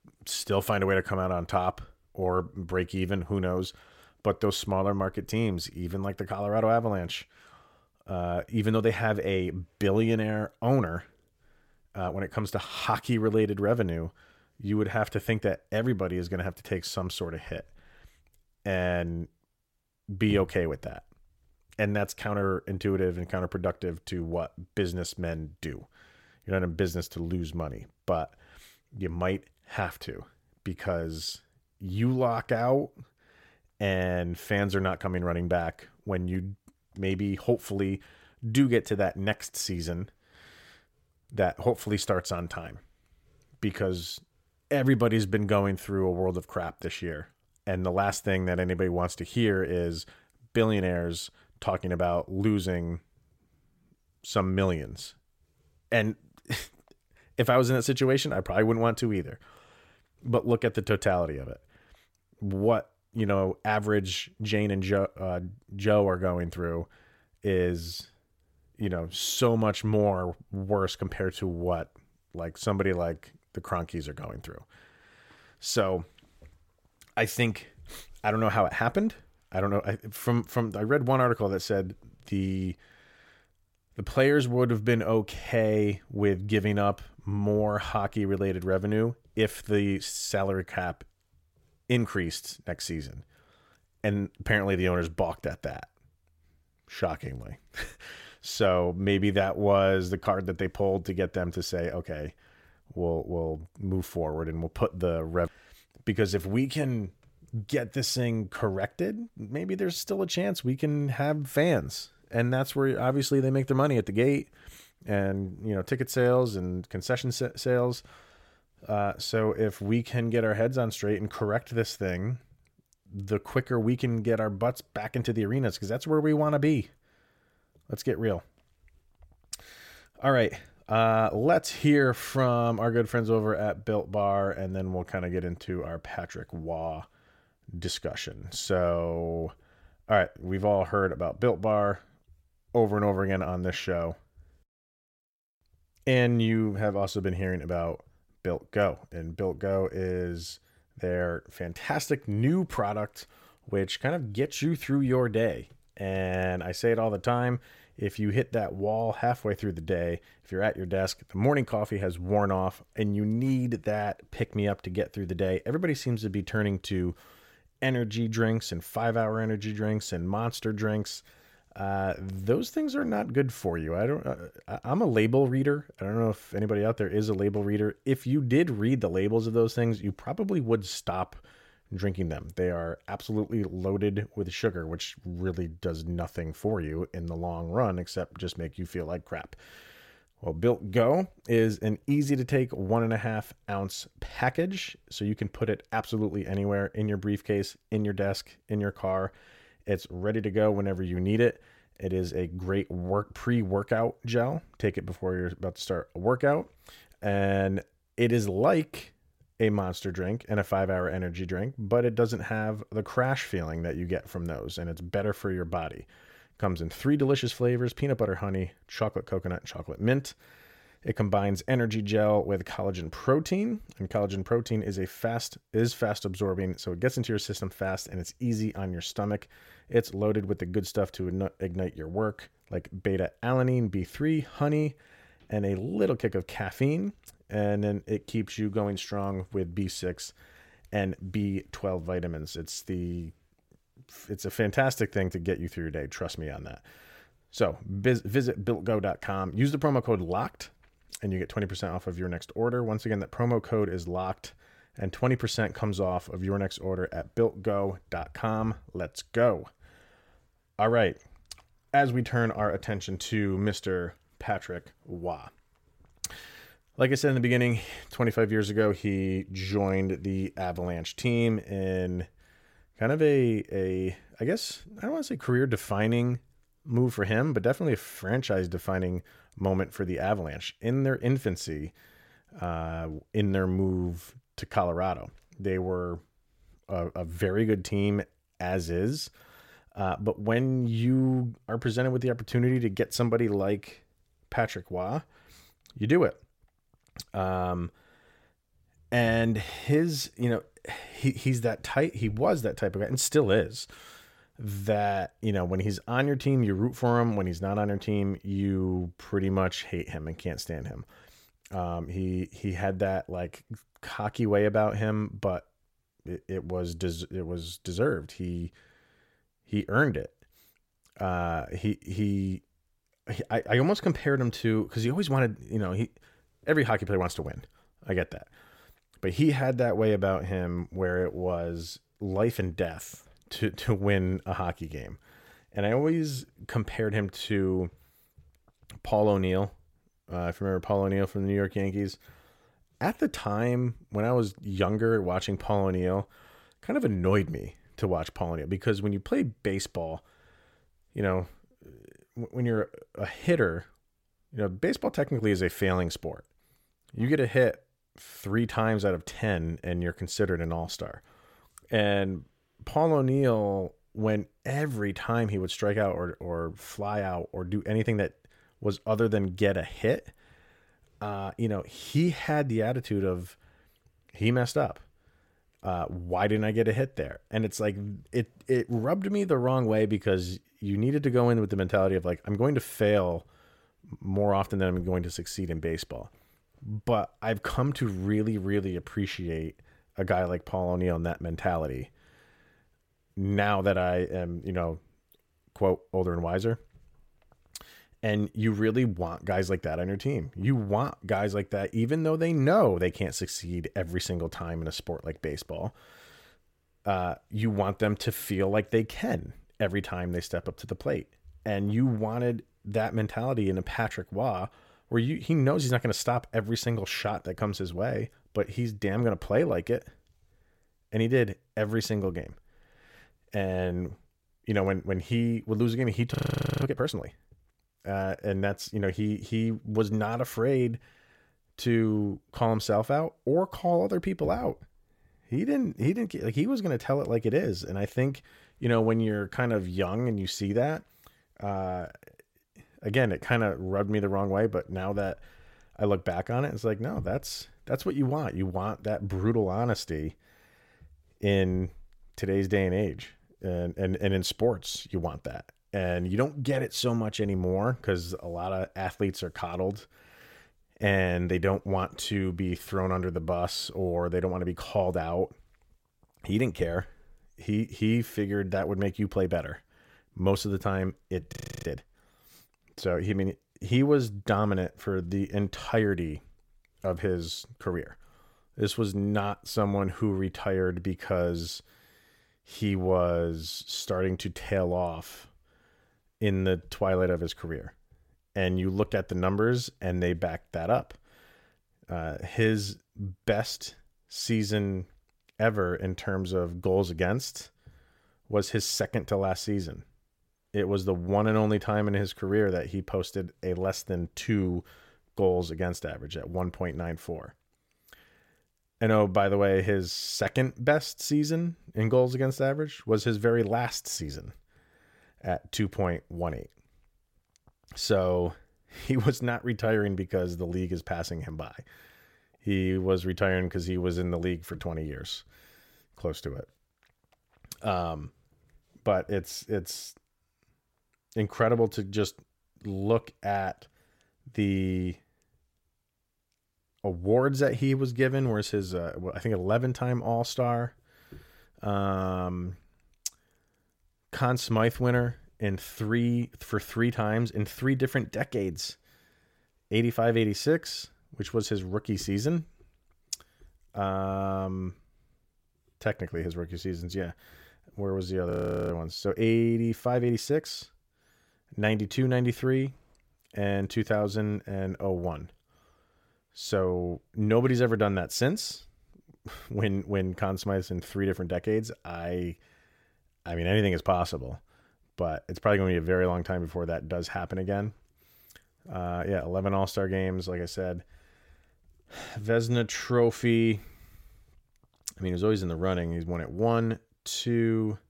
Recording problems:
audio freezing; at 7:06, at 7:52 and at 9:19

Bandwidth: 16.5 kHz